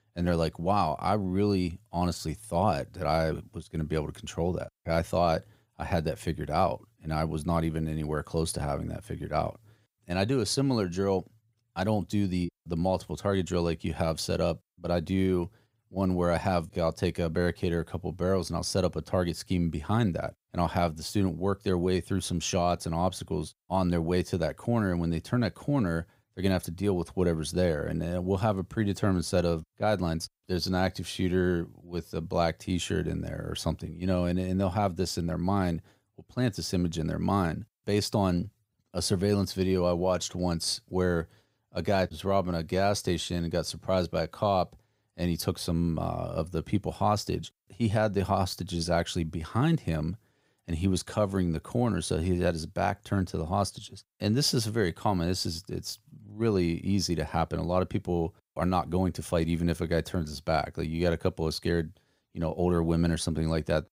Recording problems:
none

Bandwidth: 15.5 kHz